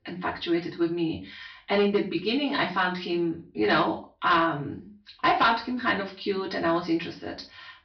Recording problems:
off-mic speech; far
high frequencies cut off; noticeable; nothing above 5.5 kHz
room echo; slight; dies away in 0.3 s
distortion; slight; 2% of the sound clipped

